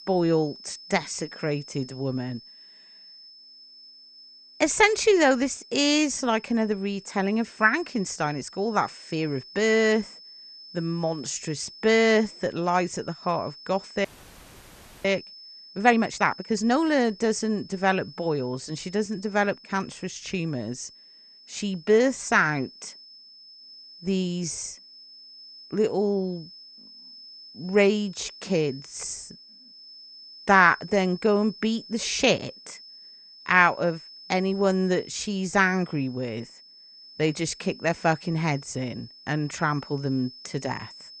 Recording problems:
garbled, watery; slightly; nothing above 8.5 kHz
high-pitched whine; noticeable; throughout; 5 kHz, 20 dB below the speech
audio freezing; at 14 s for 1 s

